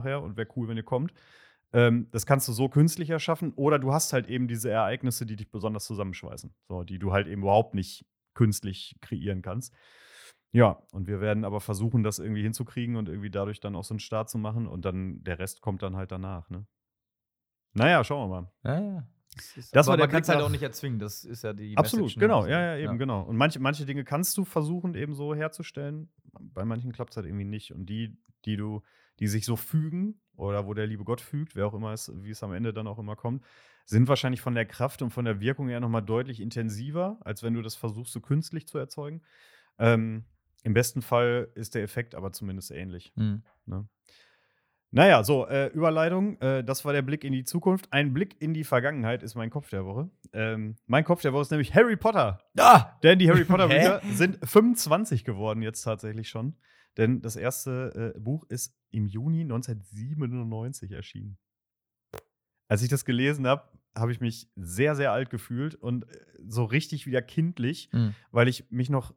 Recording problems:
abrupt cut into speech; at the start

